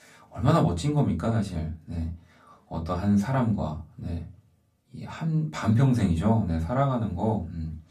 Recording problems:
off-mic speech; far
room echo; very slight; dies away in 0.2 s

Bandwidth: 14.5 kHz